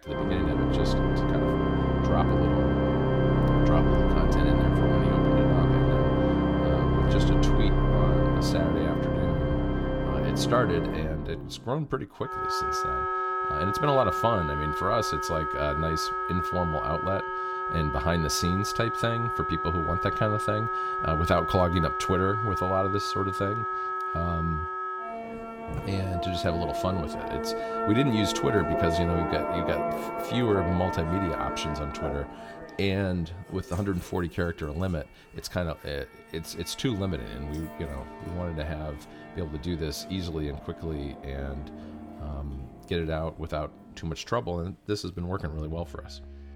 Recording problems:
background music; very loud; throughout; 3 dB above the speech

